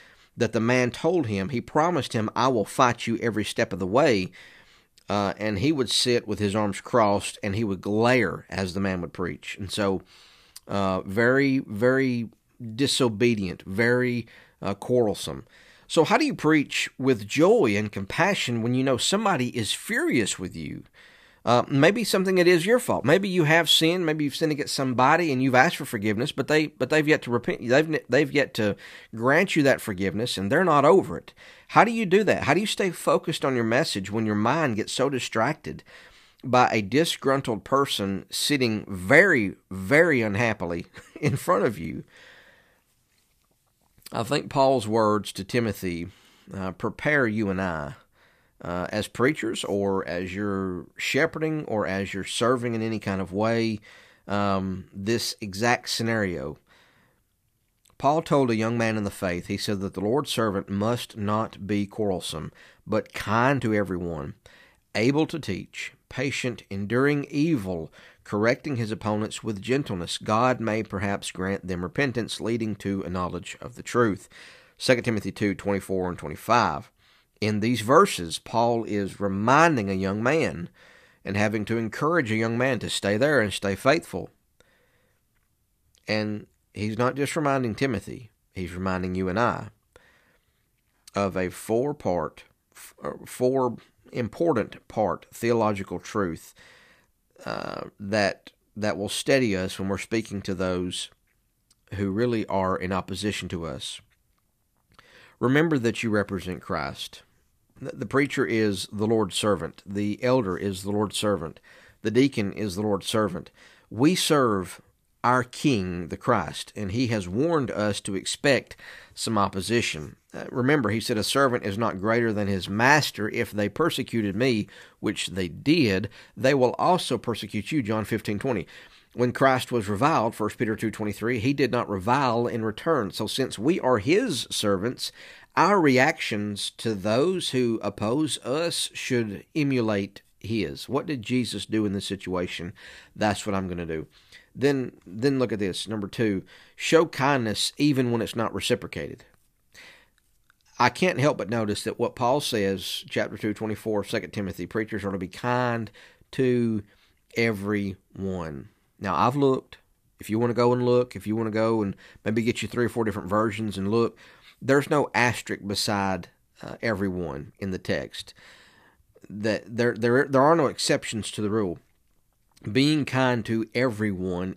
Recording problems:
none

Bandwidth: 14.5 kHz